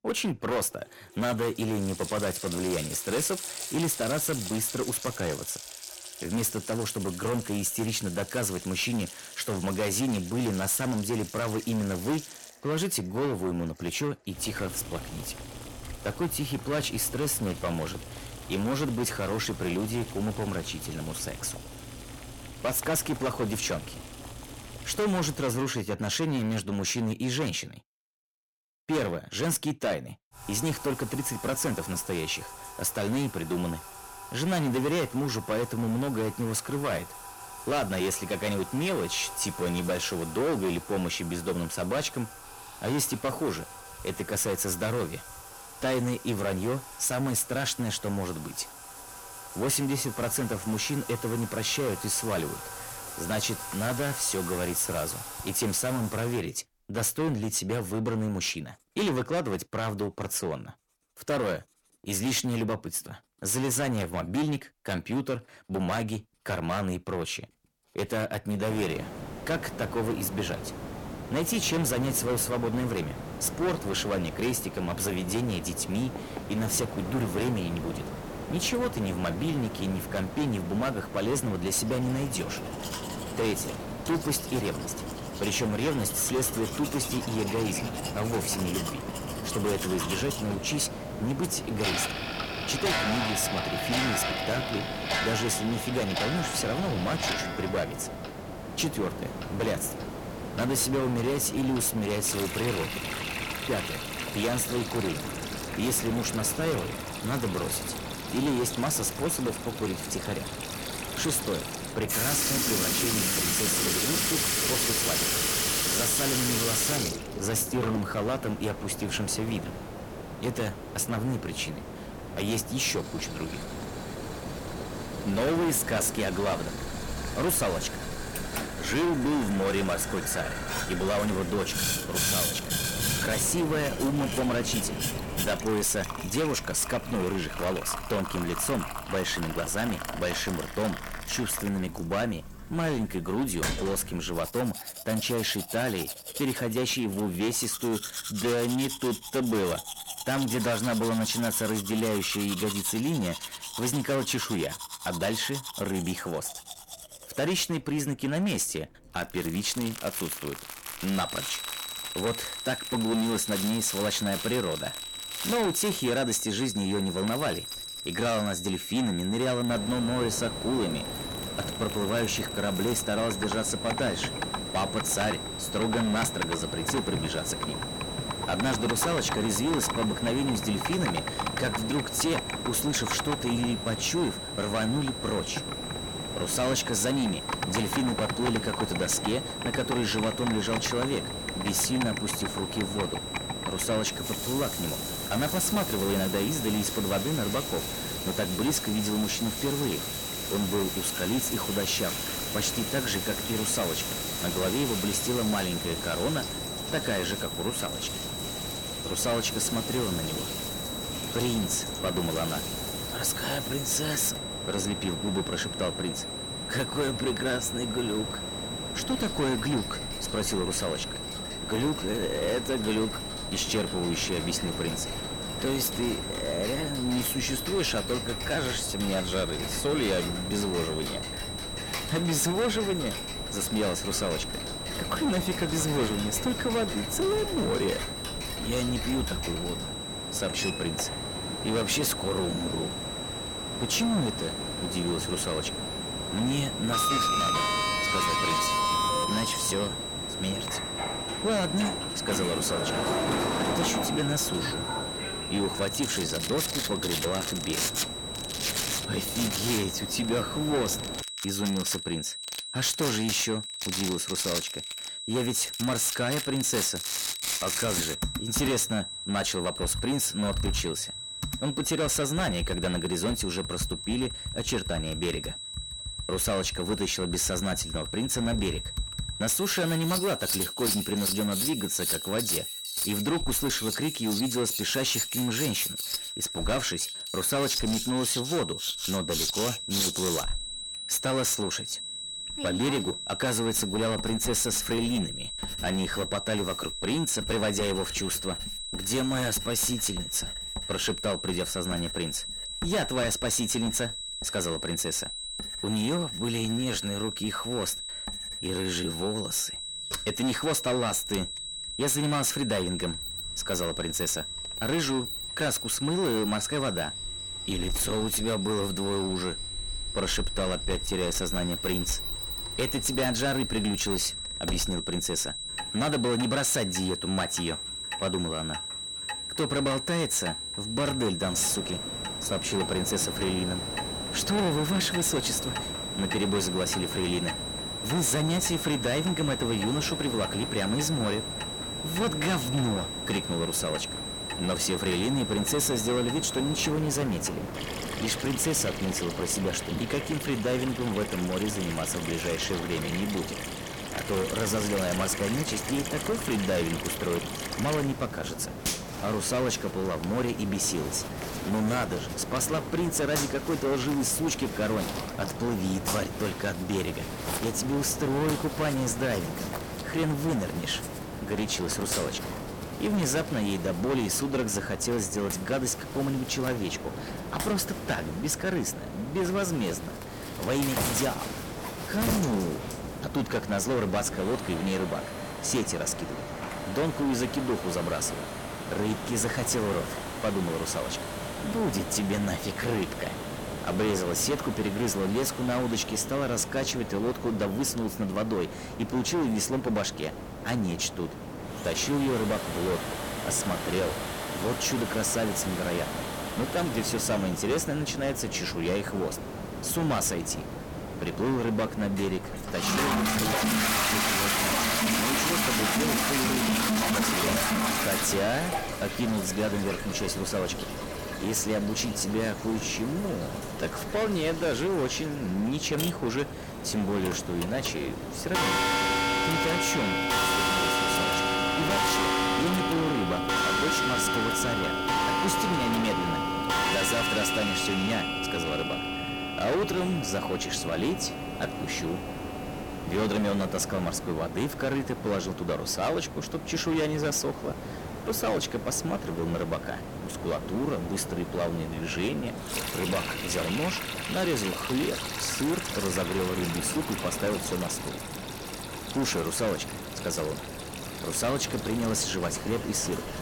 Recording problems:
distortion; heavy; 14% of the sound clipped
high-pitched whine; loud; from 2:41 to 5:47; 4 kHz, 5 dB below the speech
household noises; loud; throughout; 4 dB below the speech
hiss; loud; from 1:09 to 2:16, from 2:50 to 4:21 and from 5:31 on; 9 dB below the speech

